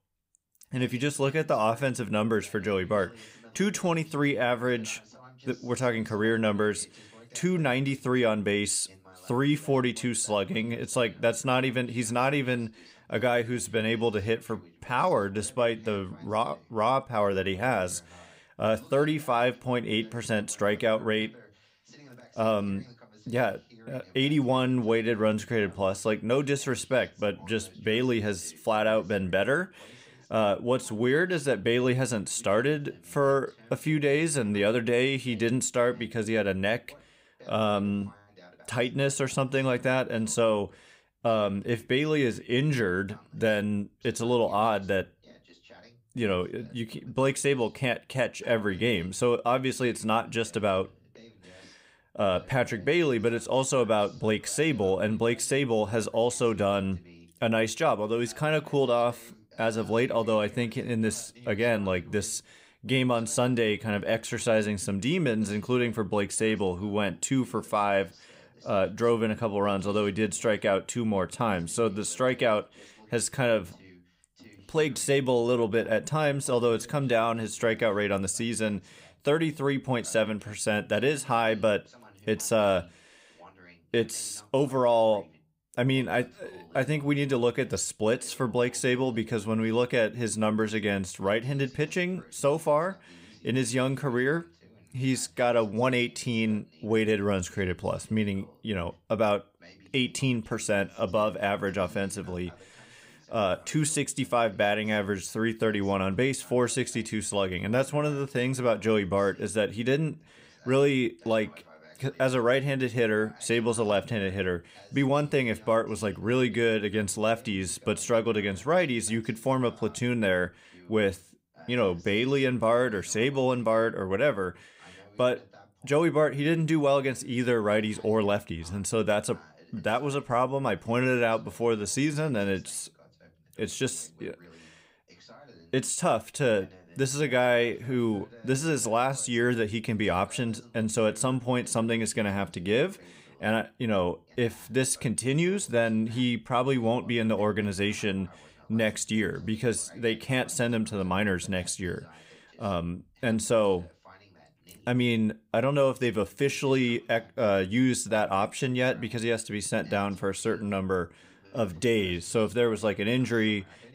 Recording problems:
voice in the background; faint; throughout; 25 dB below the speech

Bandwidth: 15.5 kHz